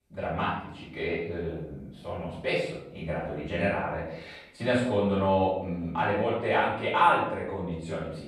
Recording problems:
off-mic speech; far
room echo; noticeable; dies away in 0.7 s

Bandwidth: 14 kHz